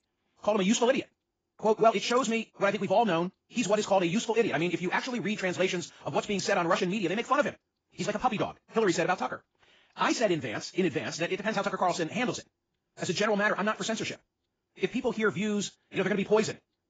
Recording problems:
garbled, watery; badly; nothing above 7.5 kHz
wrong speed, natural pitch; too fast; 1.7 times normal speed

